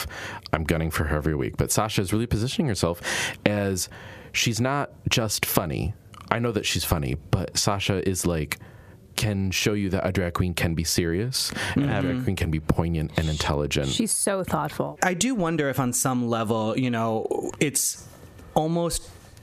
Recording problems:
squashed, flat; heavily

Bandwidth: 14.5 kHz